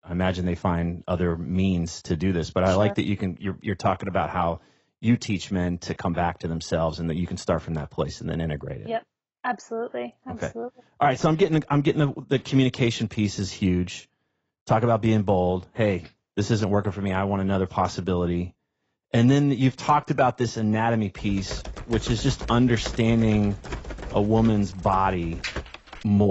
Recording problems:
garbled, watery; badly; nothing above 7.5 kHz
keyboard typing; noticeable; from 21 s on; peak 7 dB below the speech
abrupt cut into speech; at the end

